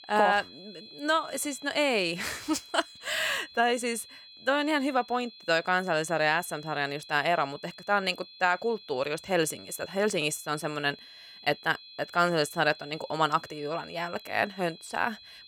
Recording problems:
high-pitched whine; noticeable; throughout; 4 kHz, 20 dB below the speech

